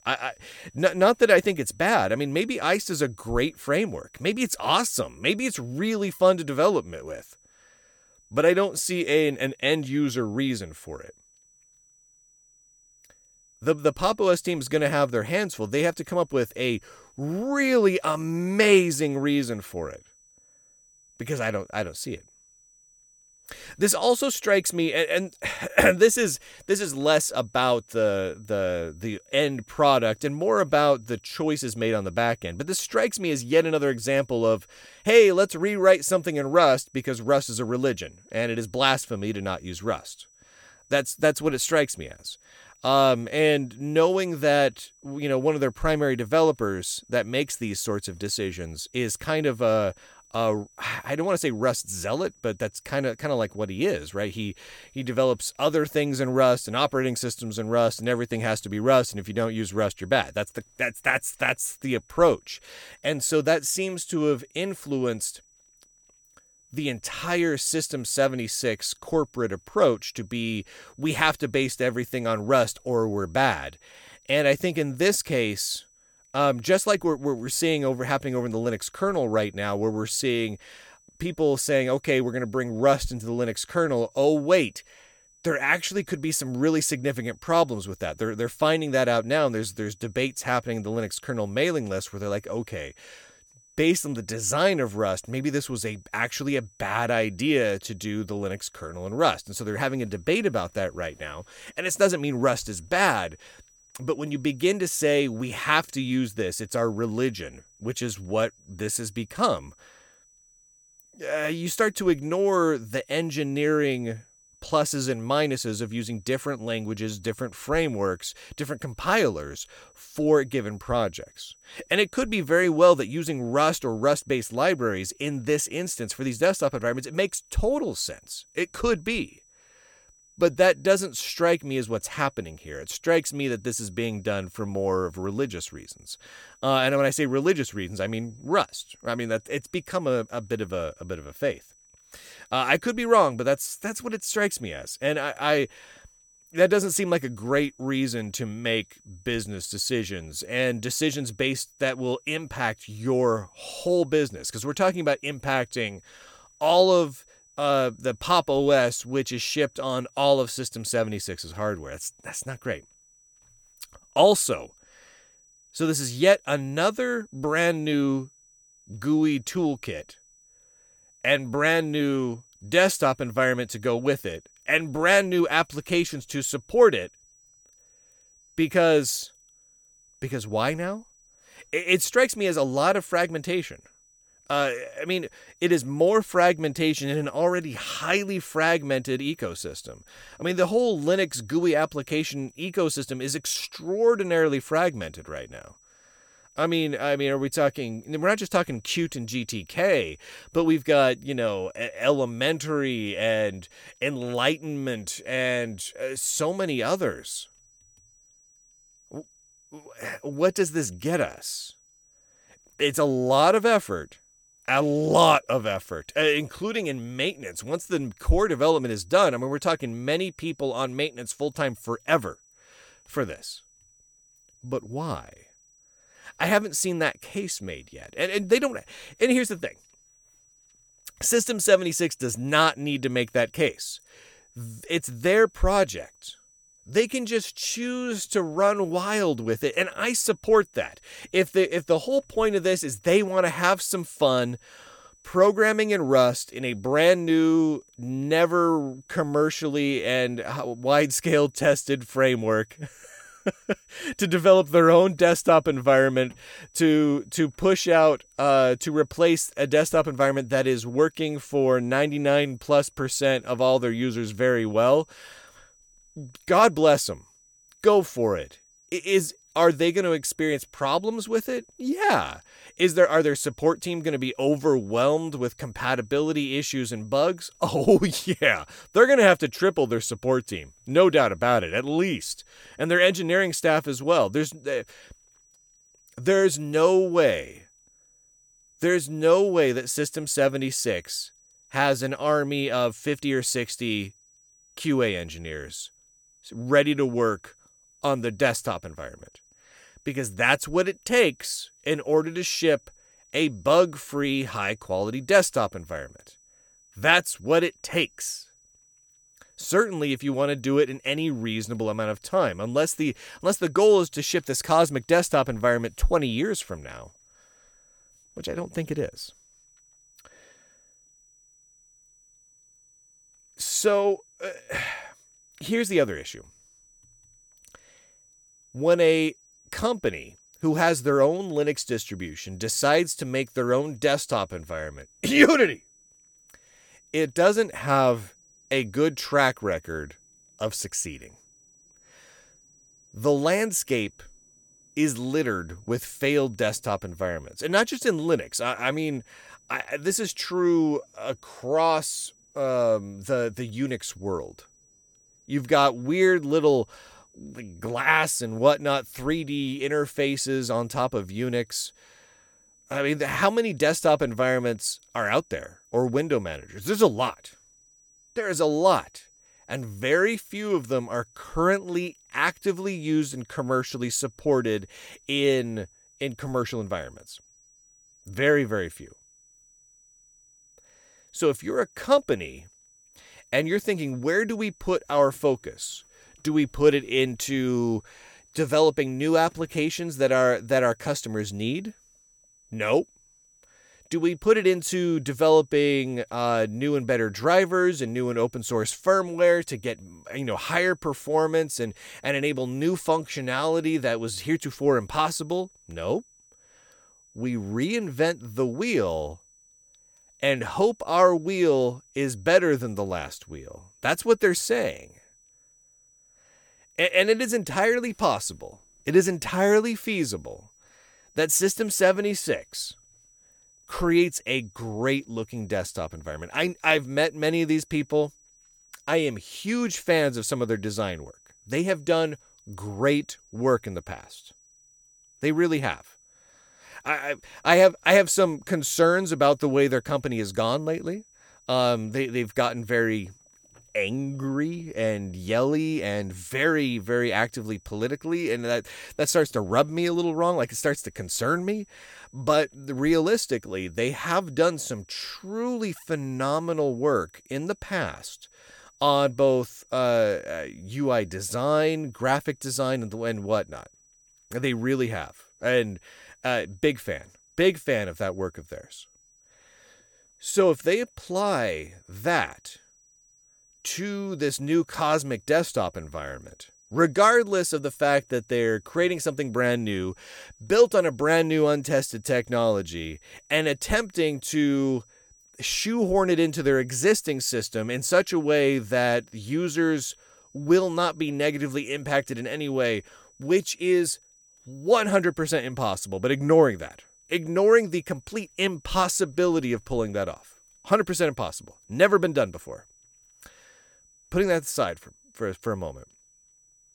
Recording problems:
high-pitched whine; faint; throughout; 6 kHz, 30 dB below the speech

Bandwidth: 18 kHz